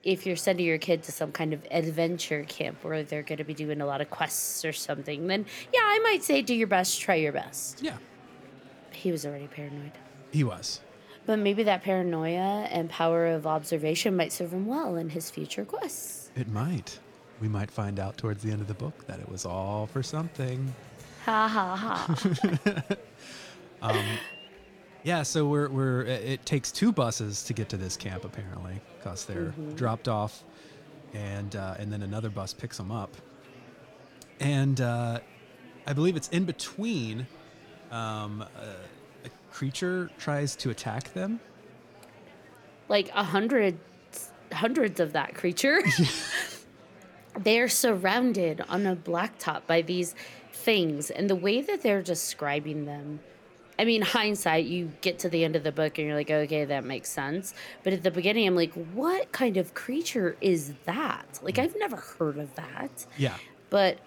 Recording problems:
murmuring crowd; faint; throughout; 25 dB below the speech

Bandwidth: 18 kHz